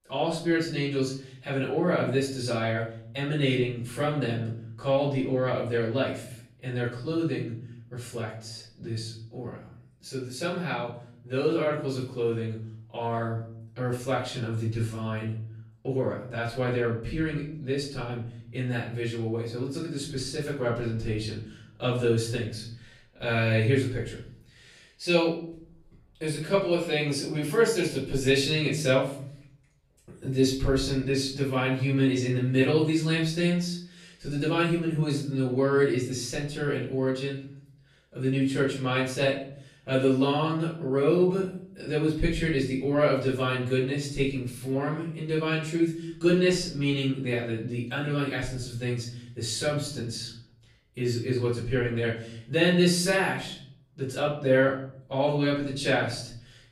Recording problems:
off-mic speech; far
room echo; noticeable; dies away in 0.6 s

